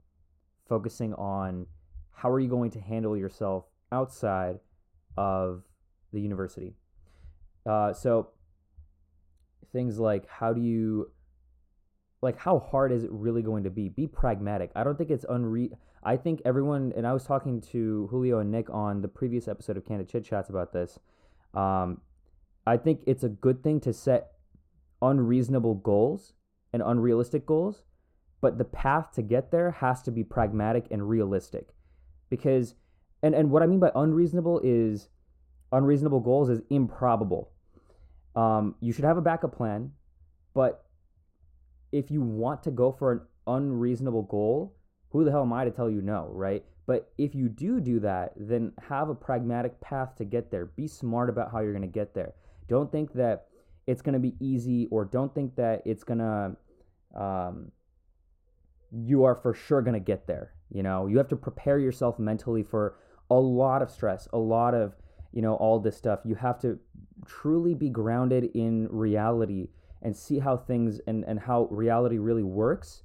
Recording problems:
muffled; very; fading above 1.5 kHz

